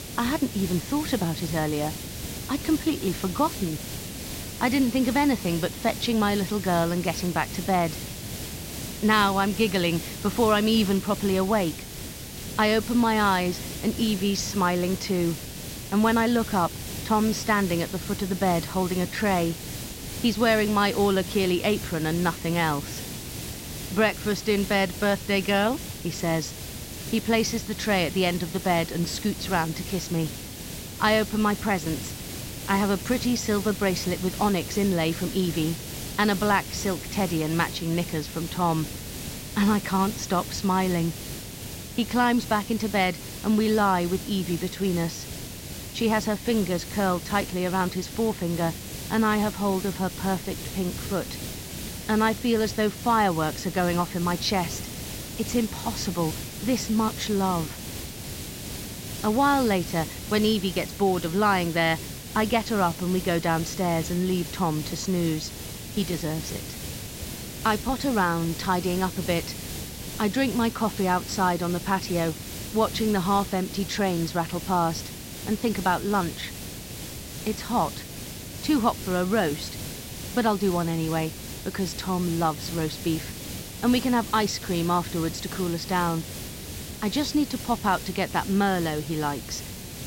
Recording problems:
high frequencies cut off; noticeable; nothing above 8 kHz
hiss; loud; throughout; 9 dB below the speech

